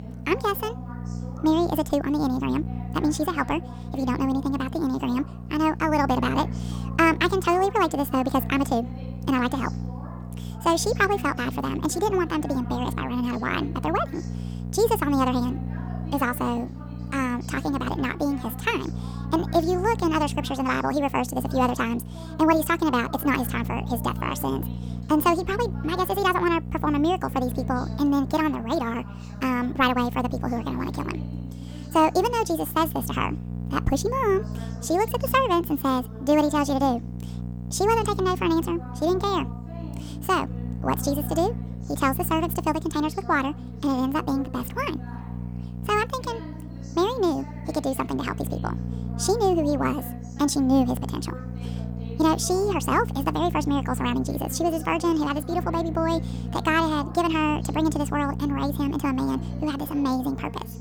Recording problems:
wrong speed and pitch; too fast and too high; 1.6 times normal speed
electrical hum; noticeable; throughout; 60 Hz, 20 dB below the speech
voice in the background; noticeable; throughout; 20 dB below the speech

